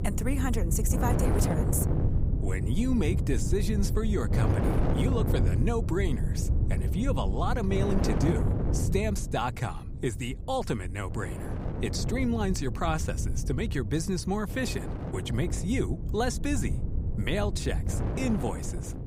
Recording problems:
wind noise on the microphone; heavy; 5 dB below the speech

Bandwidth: 15.5 kHz